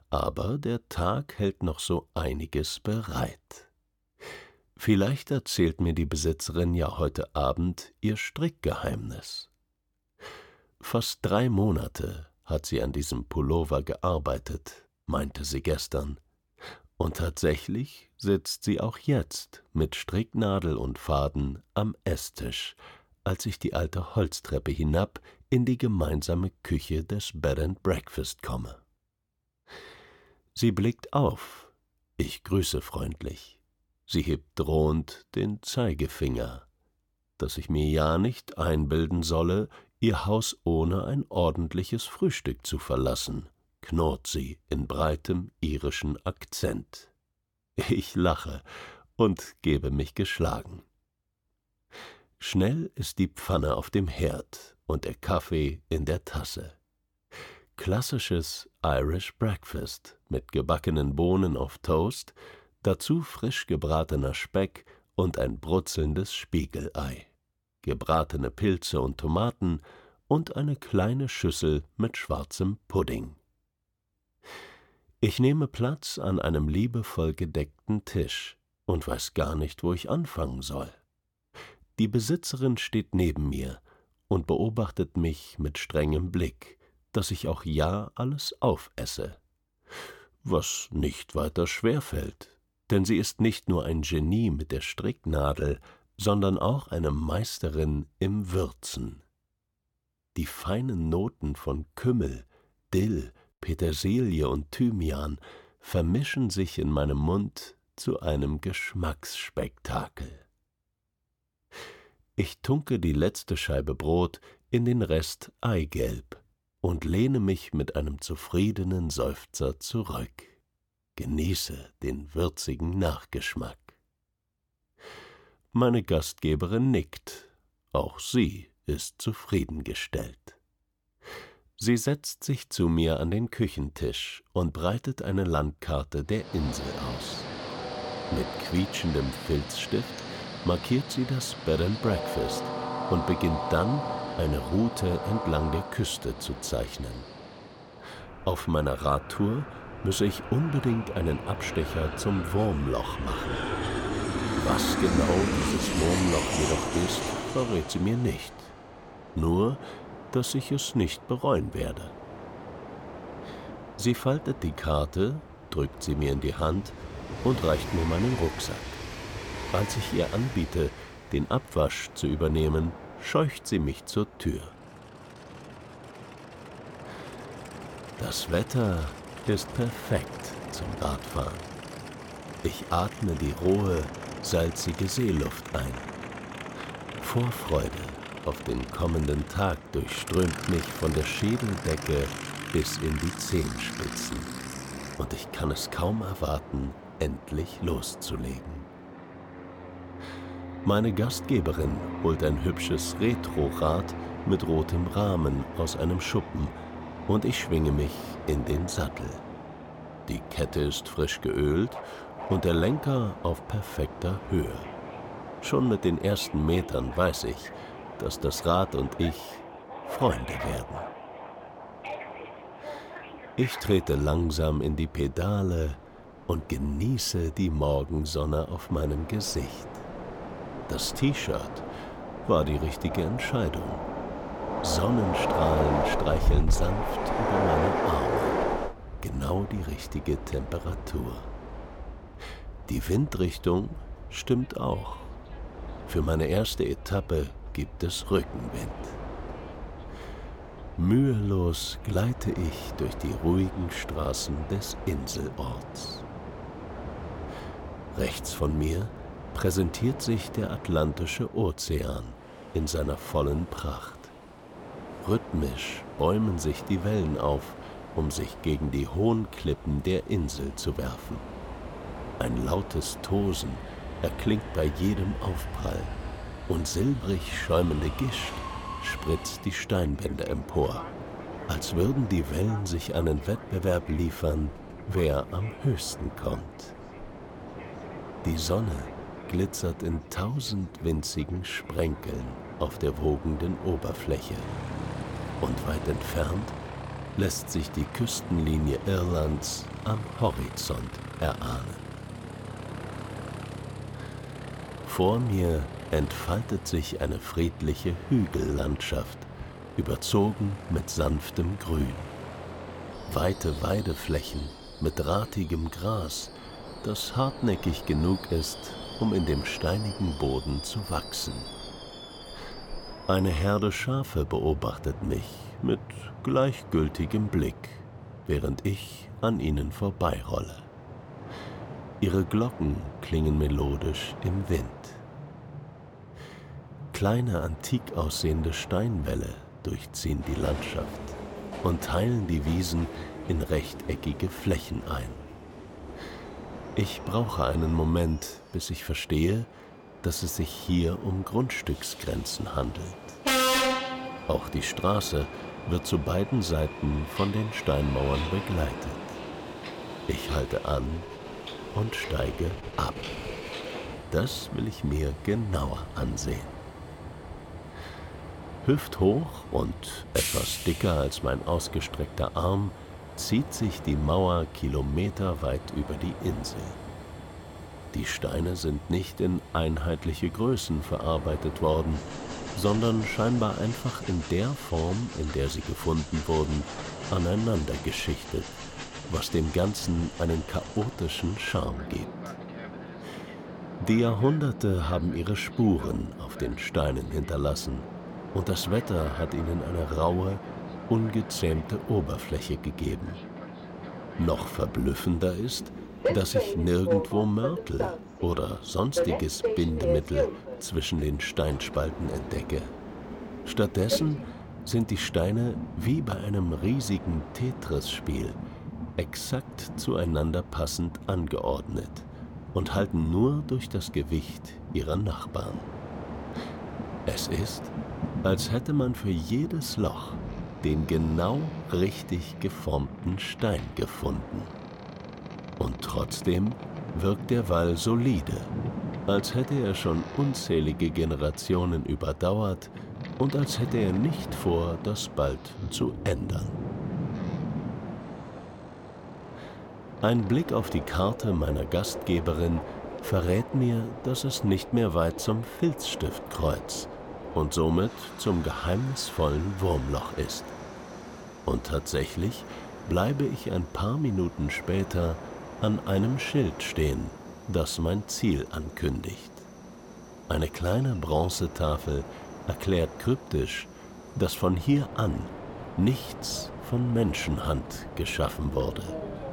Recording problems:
train or aircraft noise; loud; from 2:16 on; 8 dB below the speech

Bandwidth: 17.5 kHz